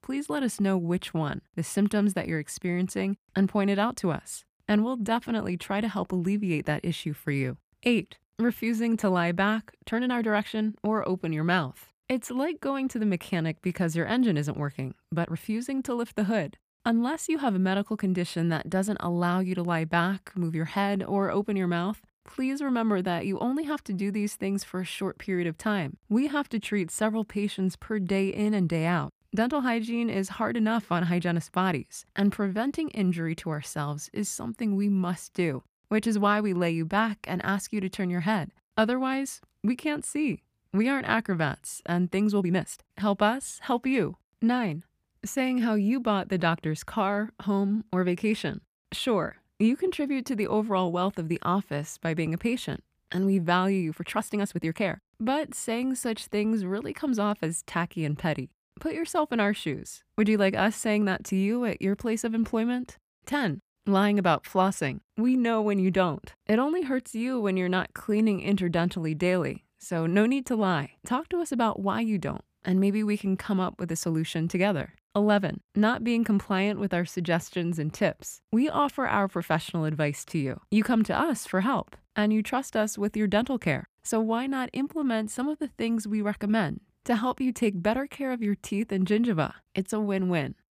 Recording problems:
uneven, jittery; strongly; from 9.5 s to 1:25

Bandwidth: 15 kHz